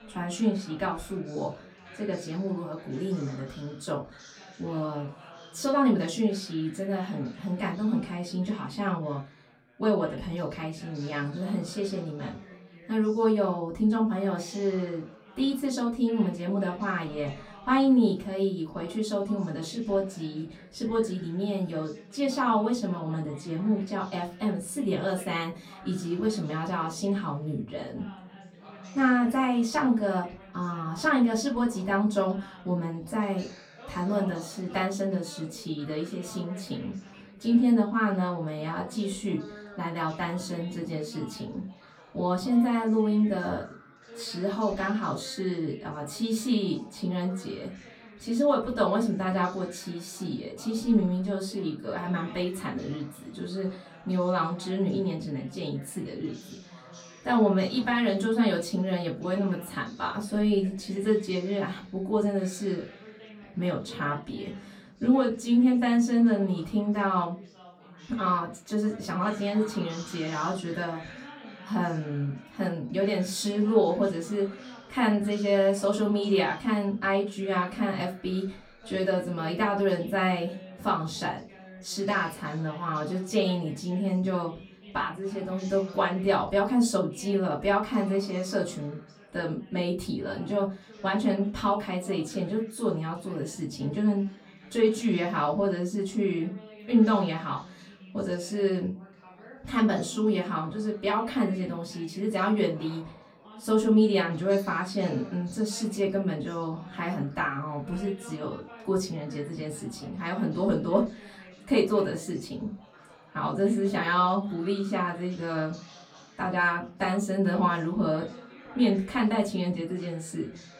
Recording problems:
off-mic speech; far
room echo; very slight; dies away in 0.2 s
background chatter; faint; throughout; 4 voices, 20 dB below the speech

